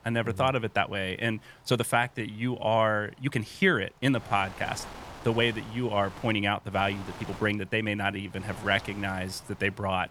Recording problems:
wind noise on the microphone; occasional gusts; 15 dB below the speech
uneven, jittery; strongly; from 0.5 to 9.5 s

